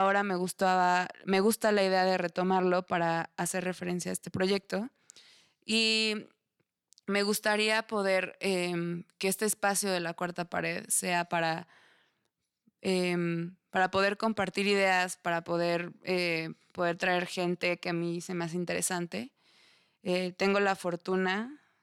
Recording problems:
abrupt cut into speech; at the start

